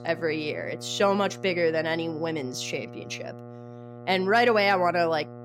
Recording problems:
electrical hum; faint; throughout; 60 Hz, 20 dB below the speech

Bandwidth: 16 kHz